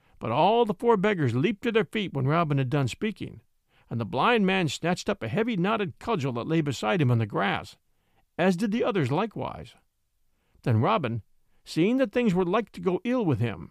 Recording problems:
none

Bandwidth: 15 kHz